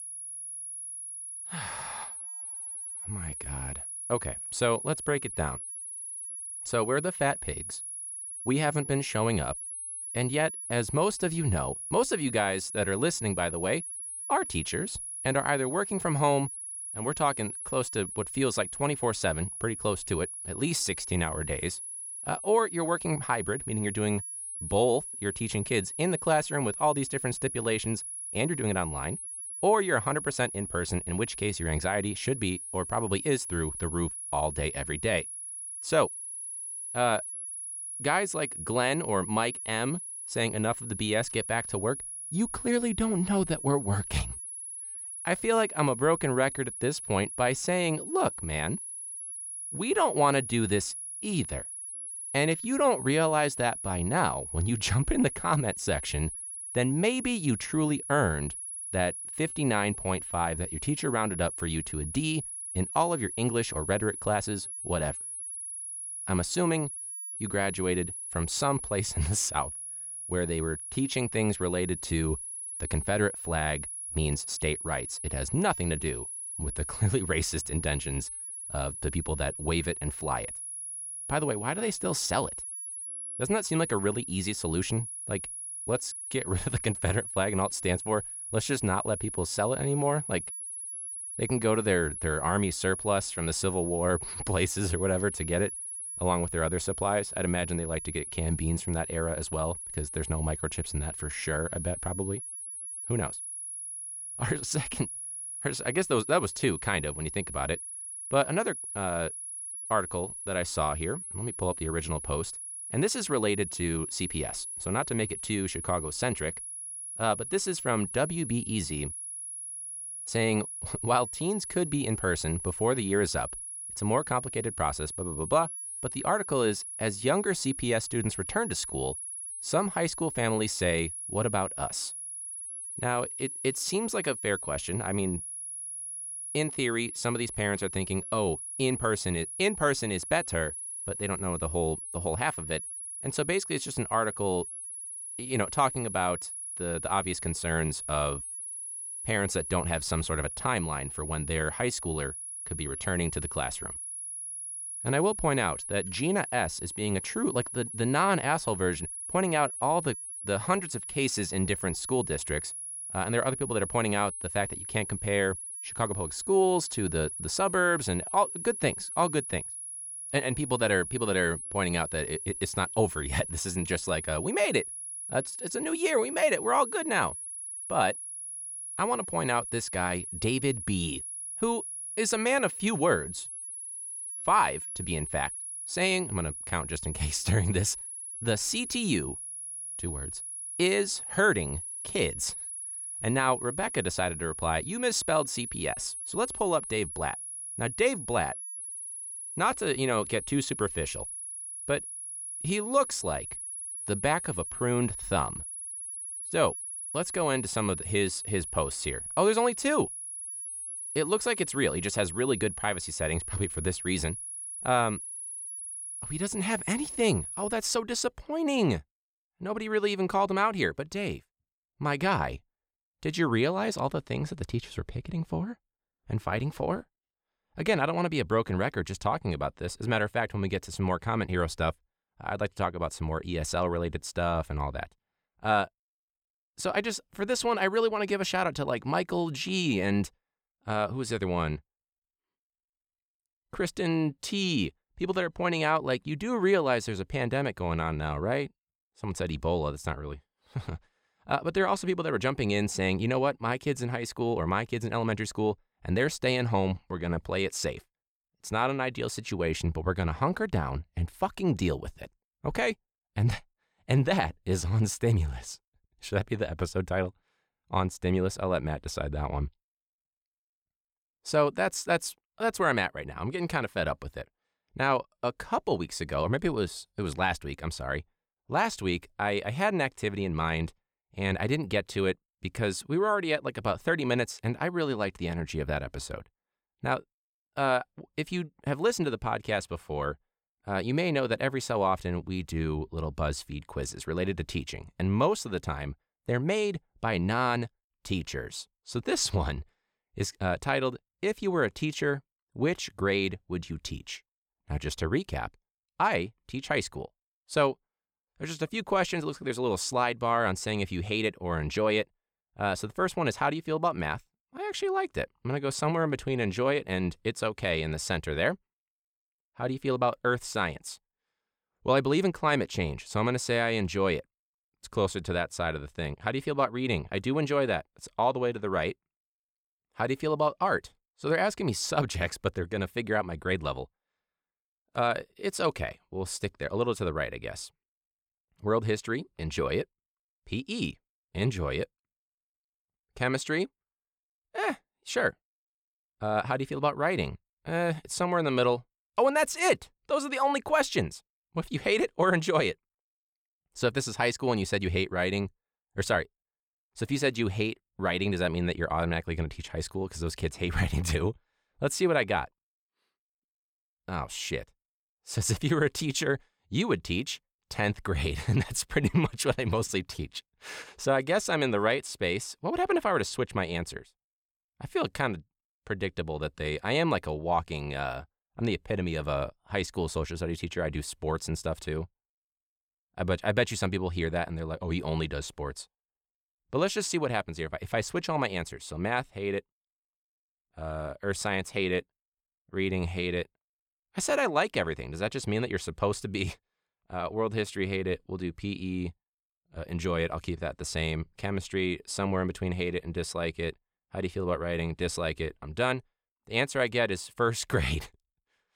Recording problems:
high-pitched whine; loud; until 3:38; 10.5 kHz, 6 dB below the speech

